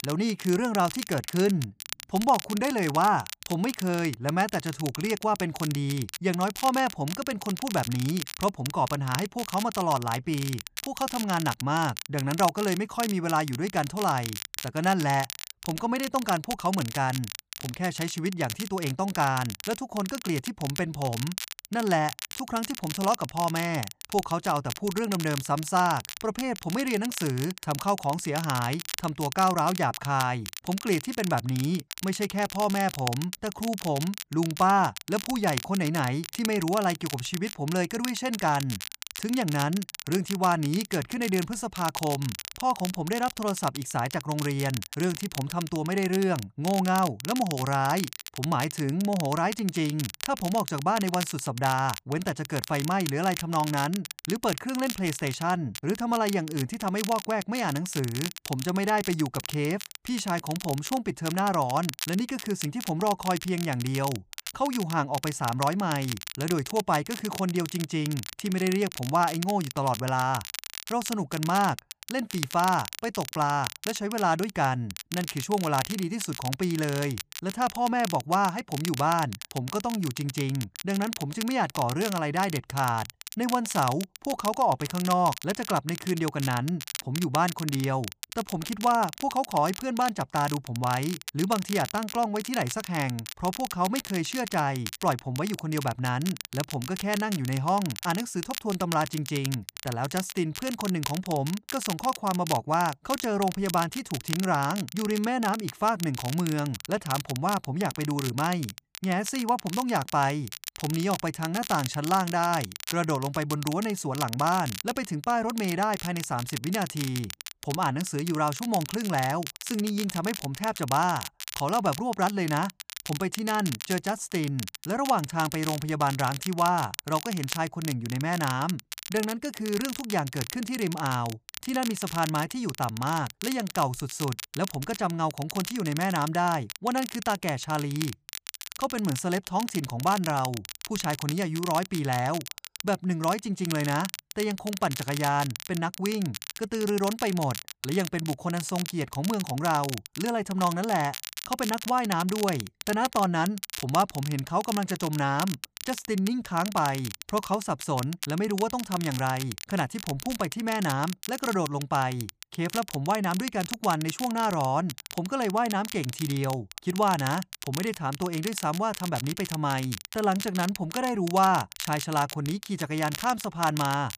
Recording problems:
crackle, like an old record; loud; 9 dB below the speech

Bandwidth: 15 kHz